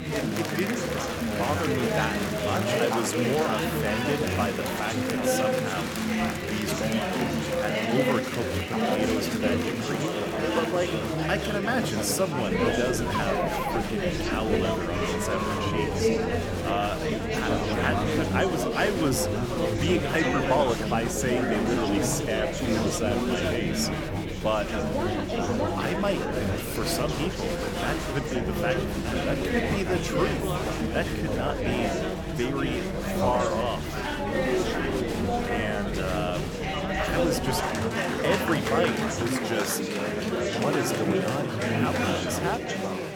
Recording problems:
chatter from many people; very loud; throughout; 3 dB above the speech

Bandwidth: 18.5 kHz